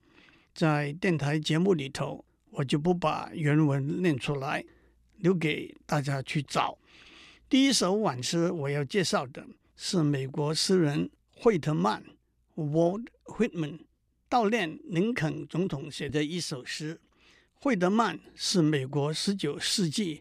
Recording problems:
none

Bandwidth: 15 kHz